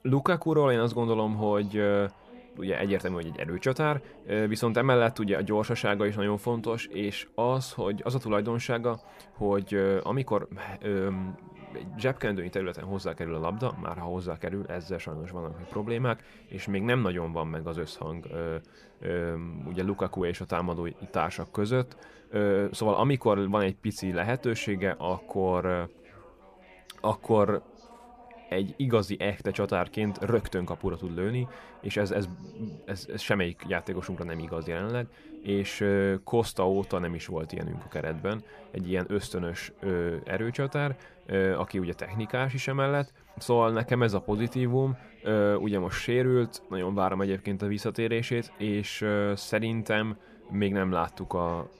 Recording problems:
background chatter; faint; throughout; 2 voices, 25 dB below the speech

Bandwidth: 14.5 kHz